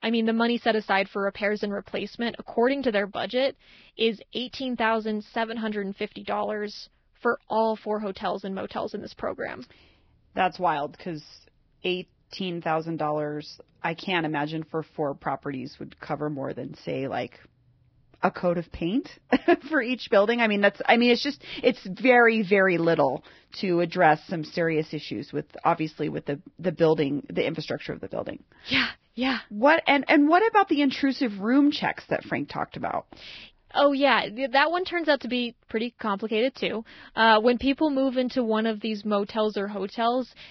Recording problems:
garbled, watery; badly; nothing above 5.5 kHz

